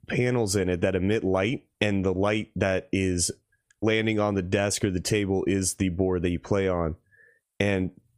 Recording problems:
squashed, flat; somewhat

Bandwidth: 15 kHz